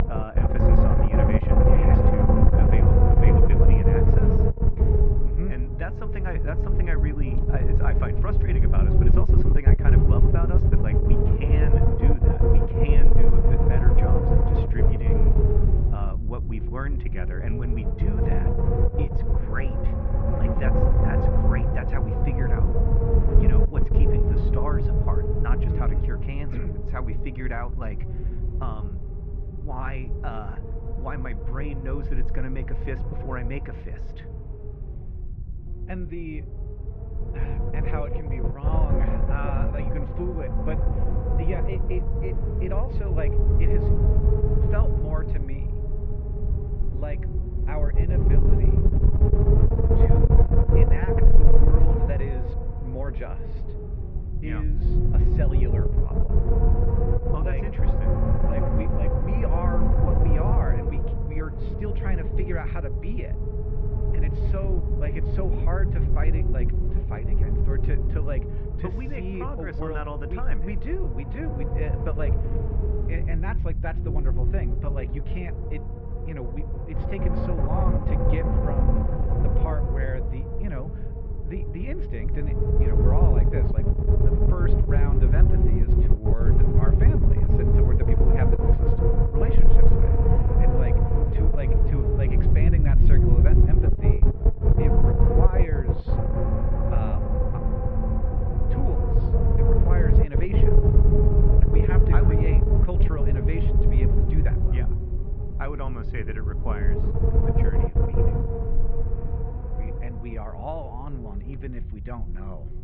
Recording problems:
muffled; very; fading above 2.5 kHz
wind noise on the microphone; heavy; 4 dB above the speech

